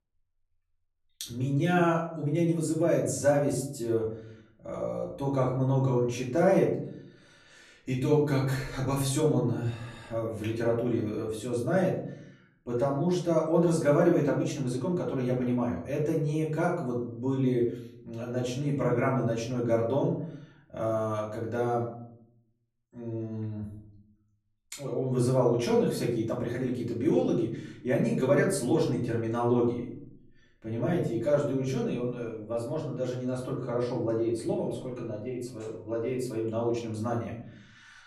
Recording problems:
off-mic speech; far
room echo; slight; dies away in 0.7 s

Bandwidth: 13.5 kHz